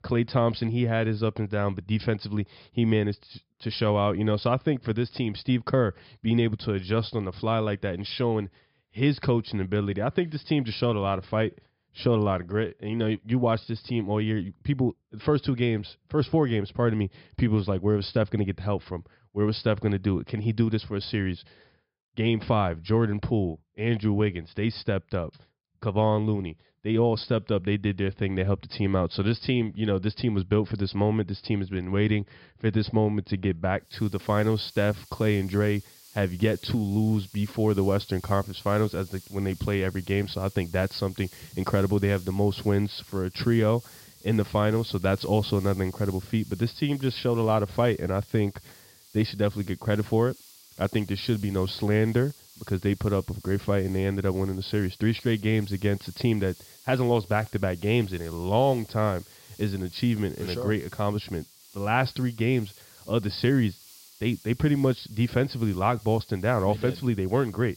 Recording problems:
high frequencies cut off; noticeable; nothing above 5.5 kHz
hiss; faint; from 34 s on; 20 dB below the speech

